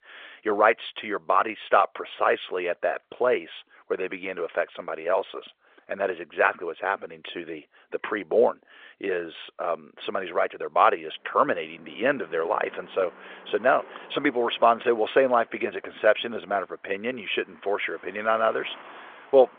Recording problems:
phone-call audio; nothing above 3.5 kHz
traffic noise; faint; from 10 s on; 25 dB below the speech

